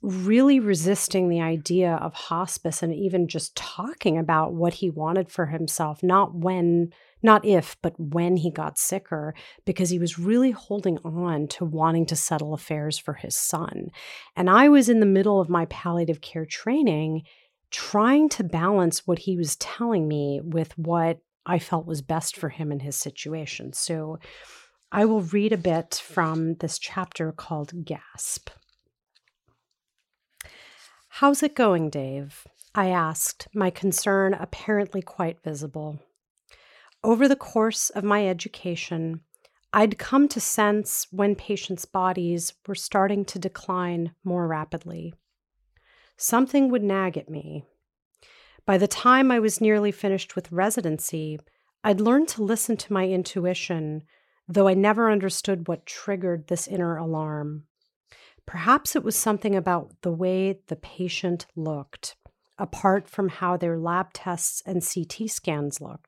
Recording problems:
none

